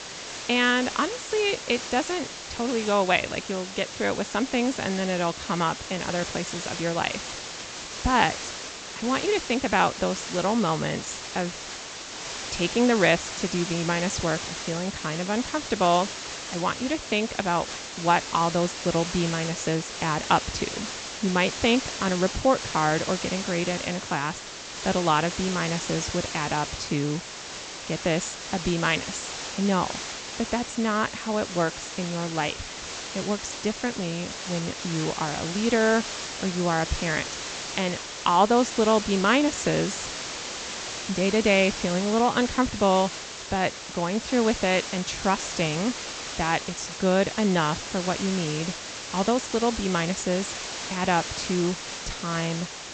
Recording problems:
high frequencies cut off; noticeable; nothing above 8 kHz
hiss; loud; throughout; 7 dB below the speech

